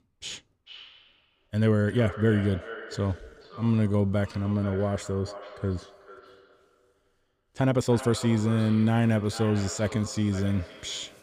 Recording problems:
echo of what is said; noticeable; throughout; 440 ms later, 15 dB below the speech
uneven, jittery; strongly; from 1.5 to 11 s

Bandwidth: 14.5 kHz